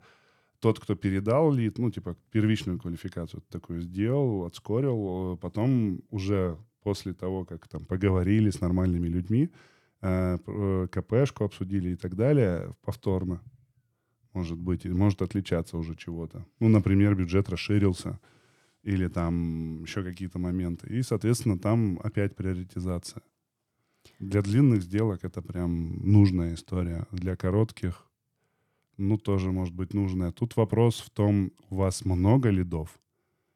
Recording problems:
none

